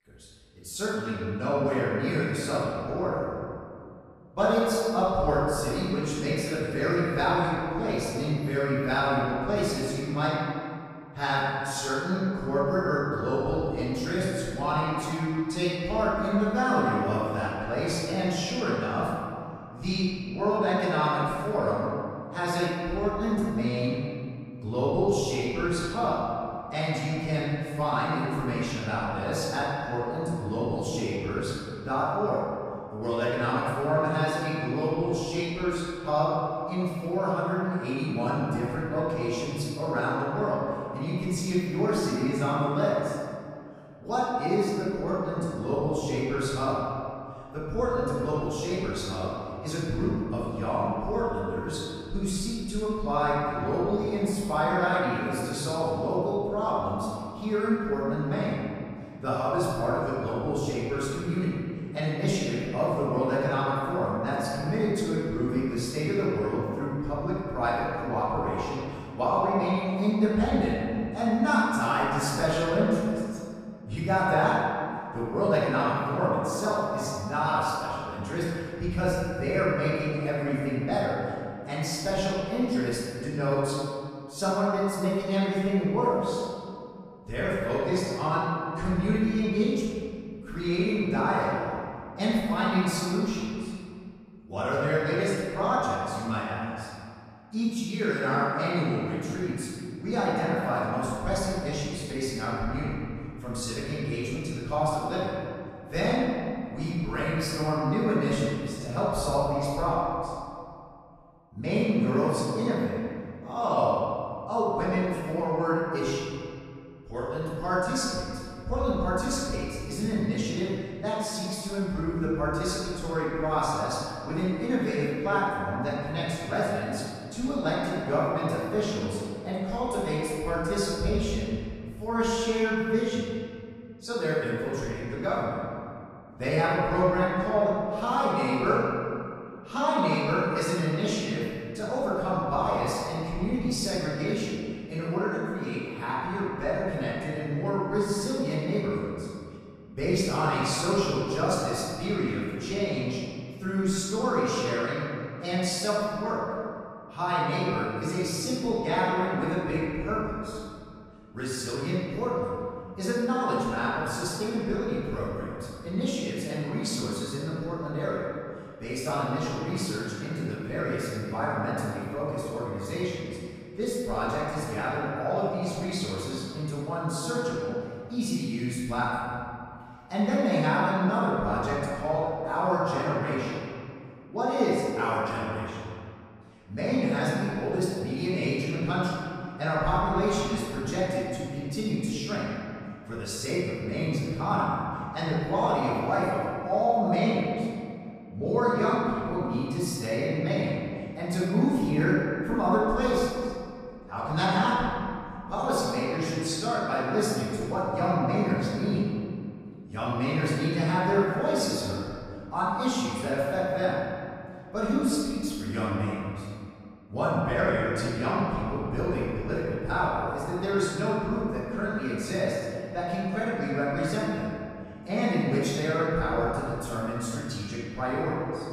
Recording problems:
room echo; strong; dies away in 2.1 s
off-mic speech; far

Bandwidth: 14.5 kHz